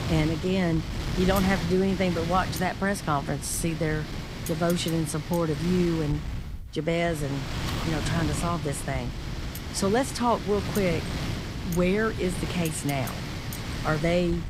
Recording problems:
wind noise on the microphone; heavy; 8 dB below the speech

